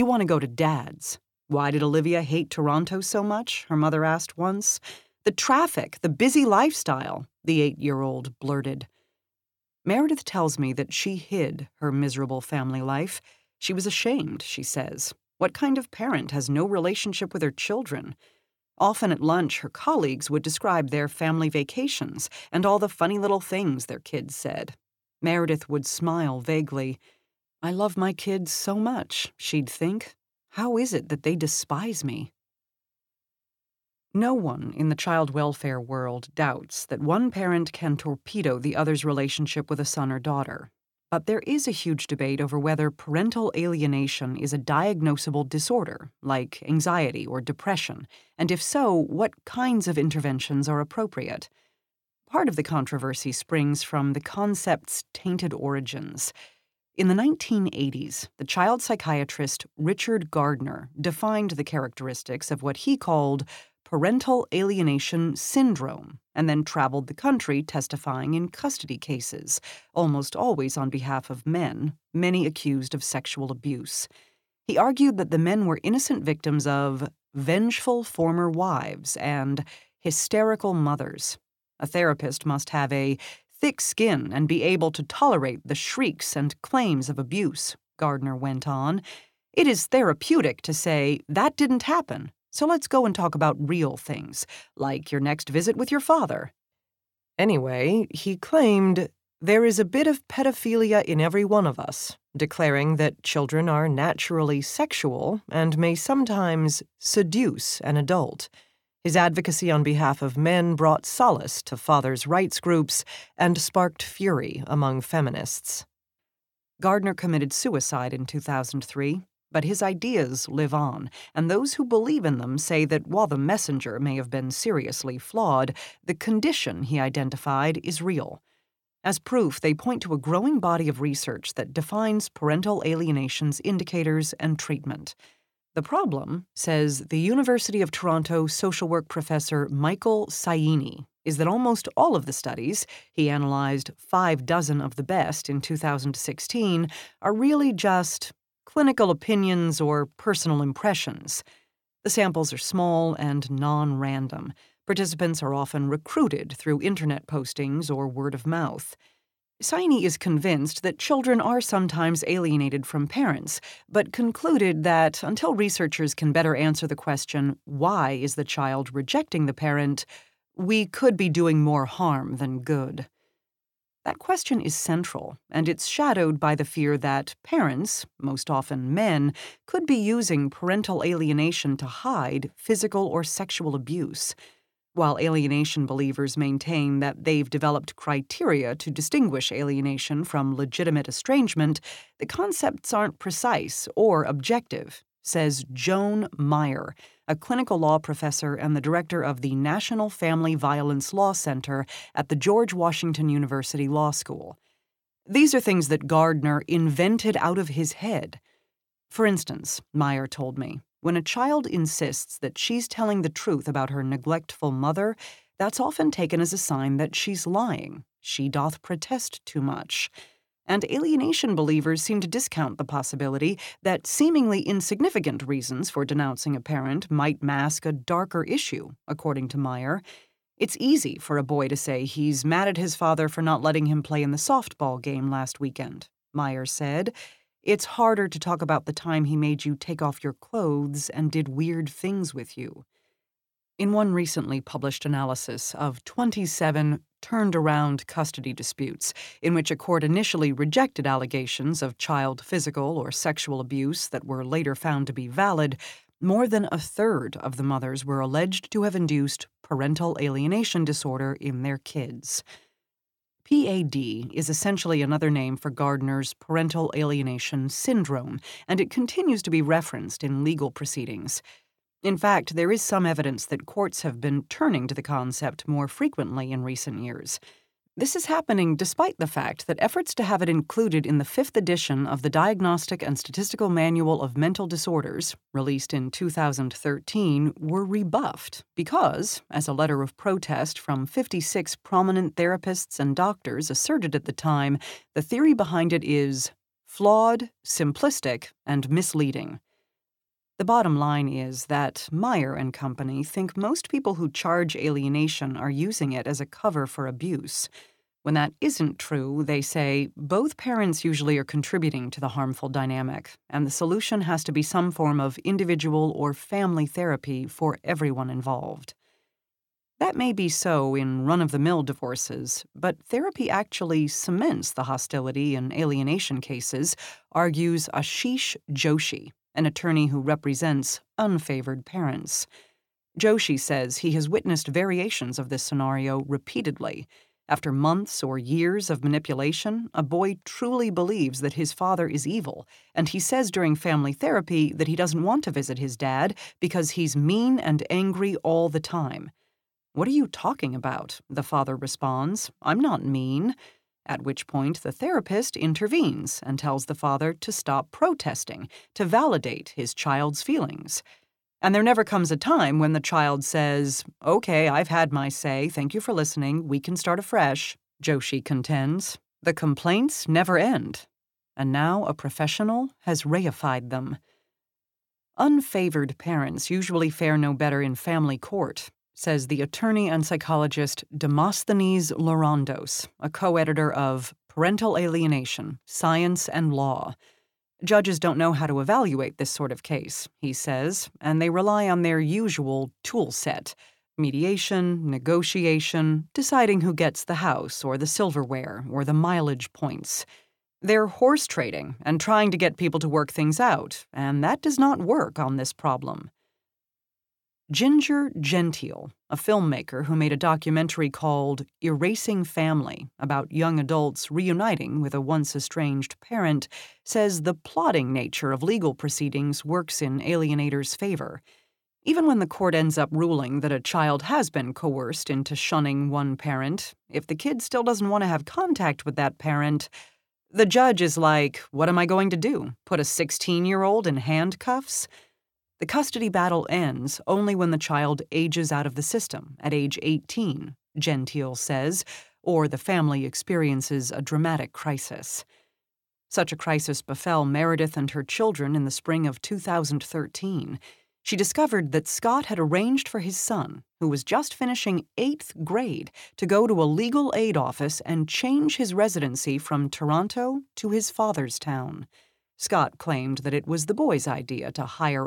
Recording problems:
abrupt cut into speech; at the start and the end

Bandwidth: 17 kHz